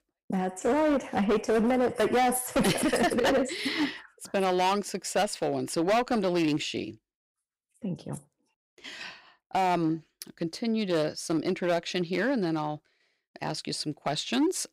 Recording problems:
distortion; heavy; 8% of the sound clipped

